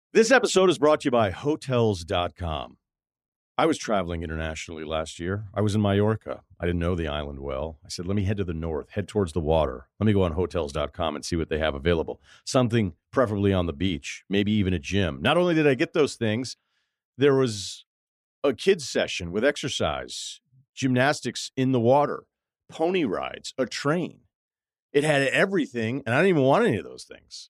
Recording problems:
none

